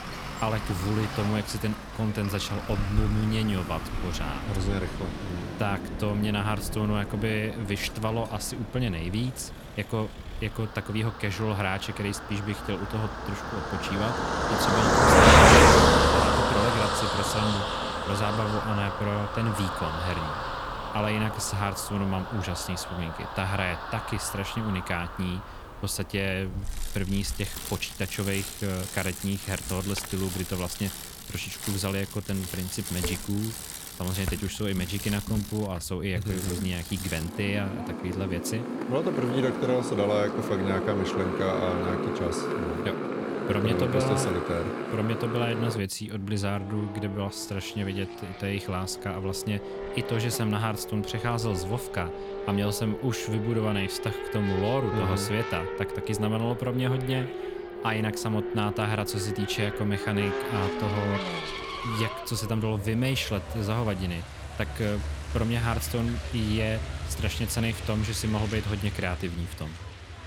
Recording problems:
traffic noise; very loud; throughout; 1 dB above the speech

